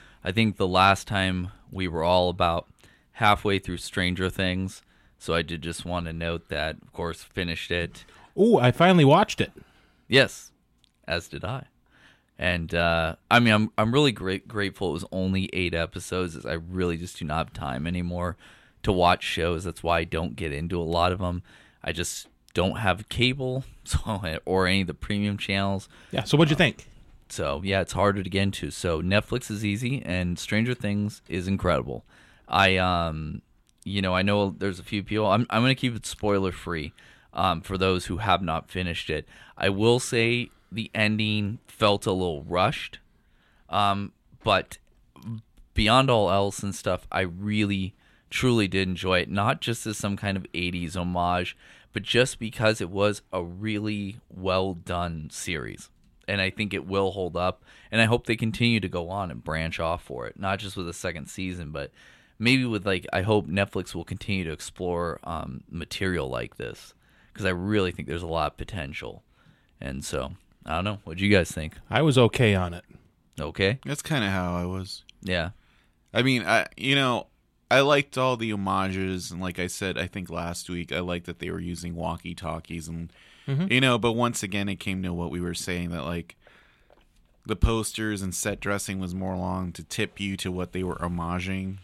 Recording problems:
none

